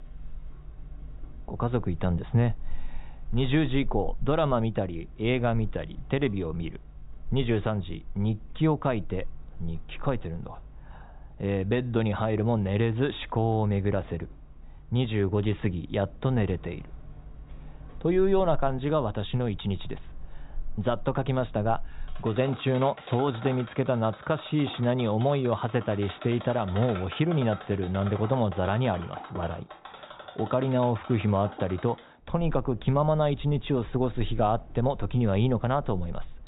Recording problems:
high frequencies cut off; severe; nothing above 4 kHz
machinery noise; noticeable; throughout; 15 dB below the speech

